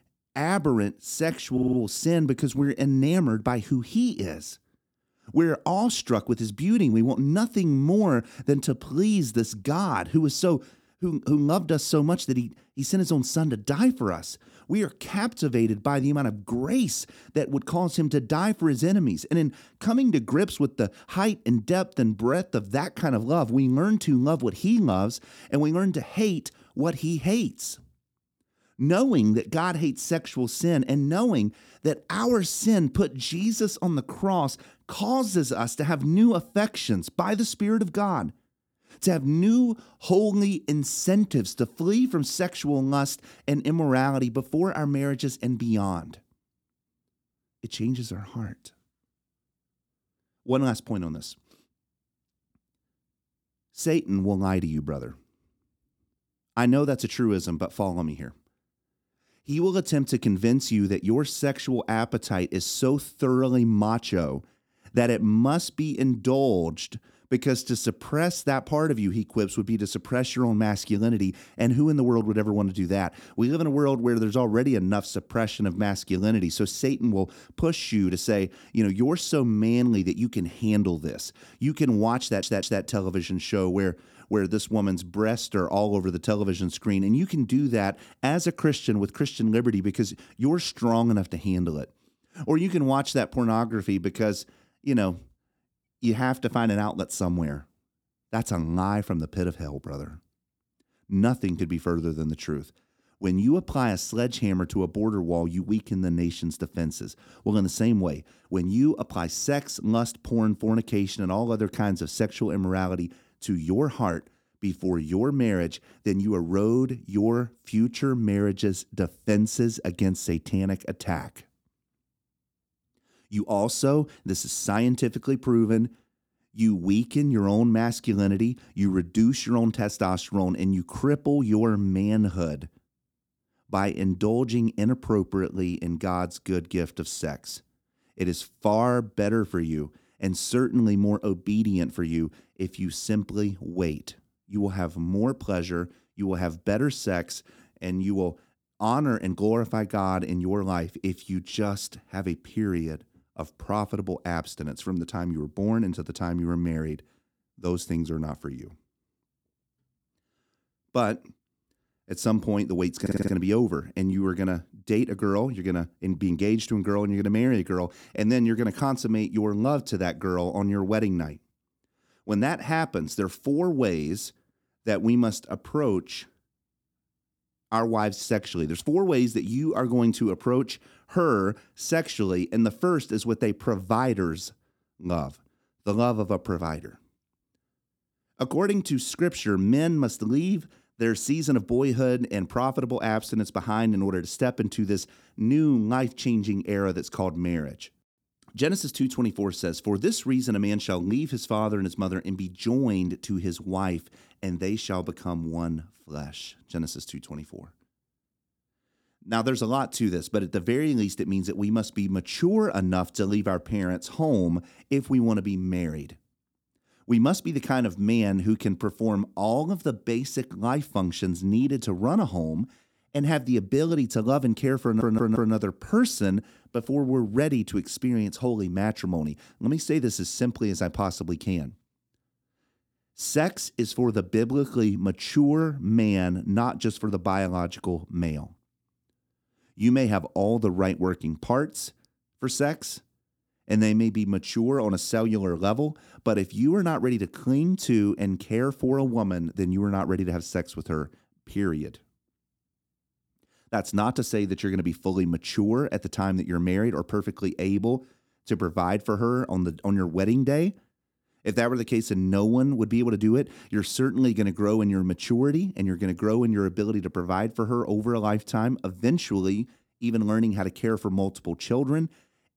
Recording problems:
audio stuttering; 4 times, first at 1.5 s

